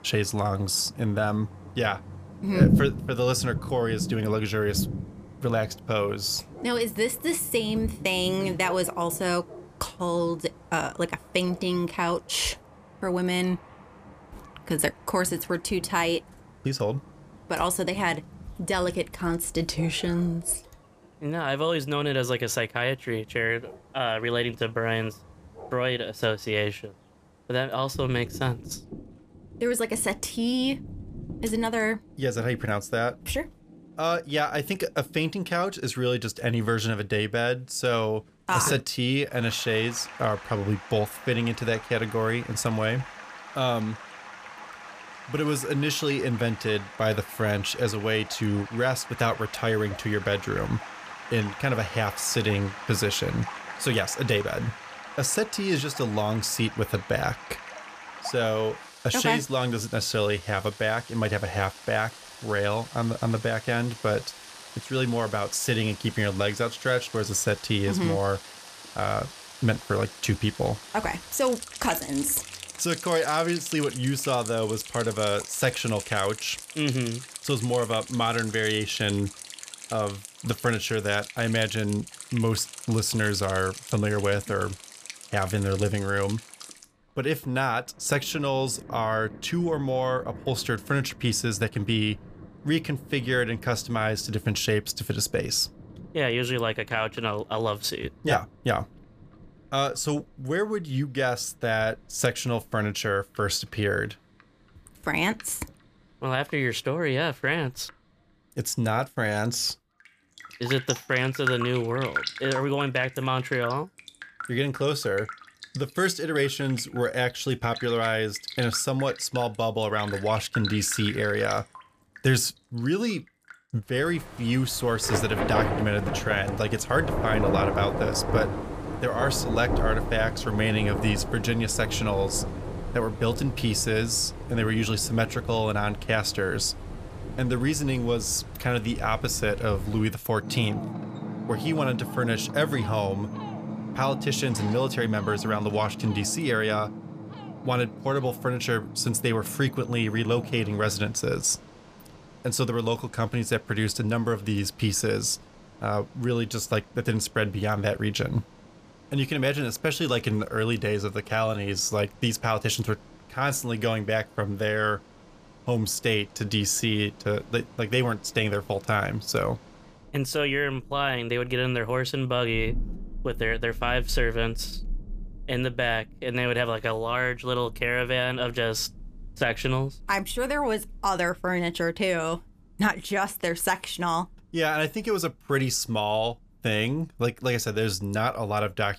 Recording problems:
rain or running water; loud; throughout; 10 dB below the speech

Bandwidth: 14.5 kHz